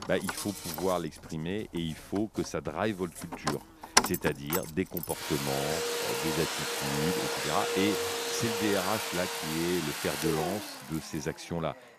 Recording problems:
household noises; very loud; throughout; 2 dB above the speech
animal sounds; noticeable; until 4 s; 10 dB below the speech

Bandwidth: 14.5 kHz